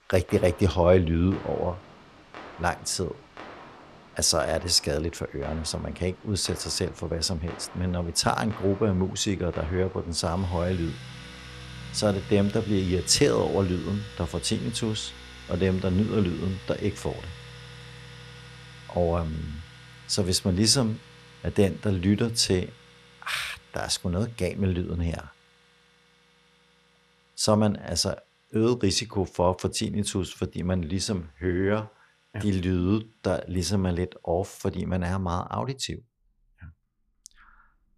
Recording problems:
household noises; noticeable; throughout; 20 dB below the speech

